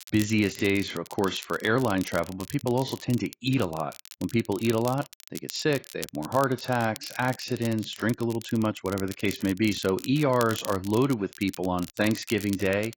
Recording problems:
garbled, watery; badly; nothing above 7.5 kHz
crackle, like an old record; noticeable; 15 dB below the speech

